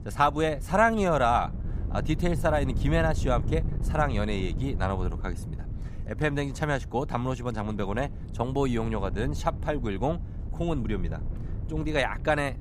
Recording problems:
wind noise on the microphone; occasional gusts; 20 dB below the speech

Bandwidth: 15 kHz